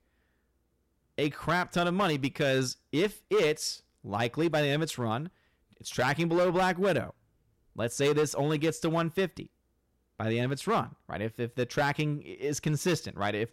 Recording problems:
distortion; slight; 5% of the sound clipped

